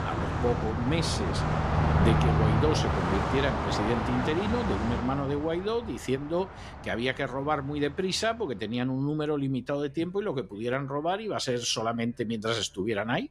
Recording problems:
traffic noise; very loud; throughout; 2 dB above the speech

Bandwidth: 14.5 kHz